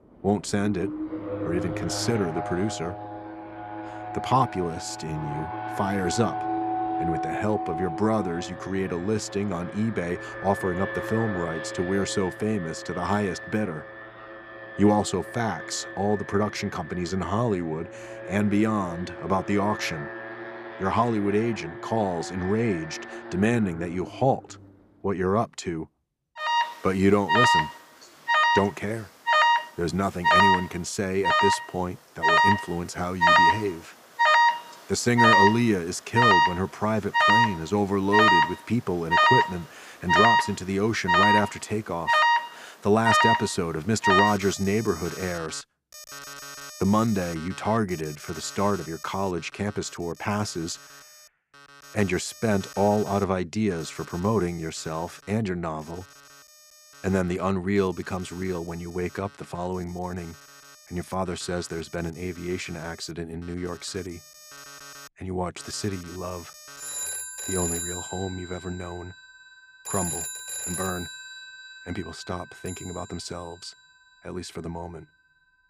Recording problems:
alarms or sirens; very loud; throughout; 3 dB above the speech

